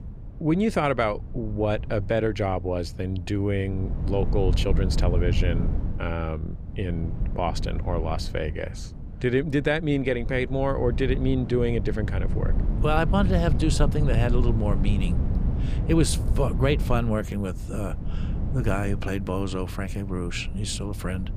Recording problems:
low rumble; noticeable; throughout; 15 dB below the speech

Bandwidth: 15 kHz